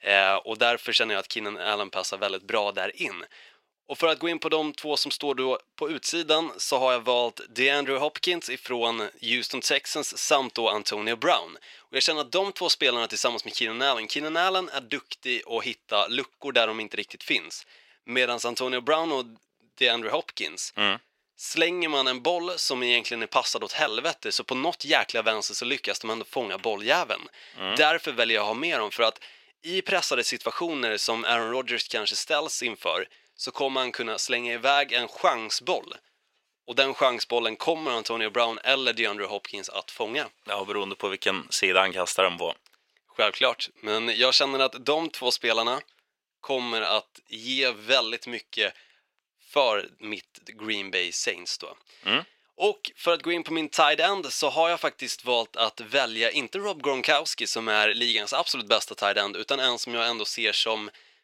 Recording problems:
thin; somewhat; fading below 450 Hz

